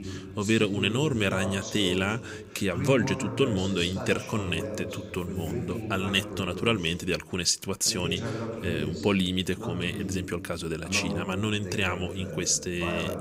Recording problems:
voice in the background; loud; throughout; 7 dB below the speech

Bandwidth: 15.5 kHz